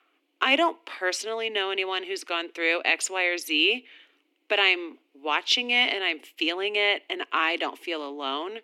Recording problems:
thin; somewhat; fading below 250 Hz

